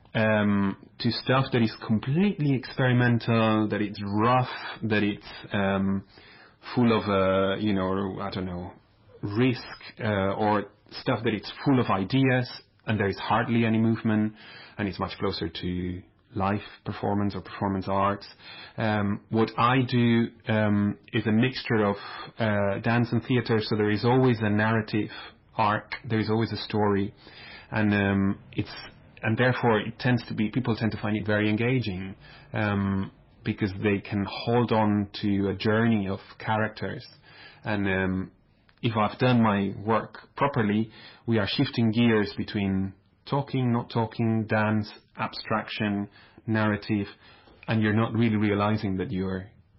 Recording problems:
garbled, watery; badly; nothing above 5.5 kHz
distortion; slight; 10 dB below the speech

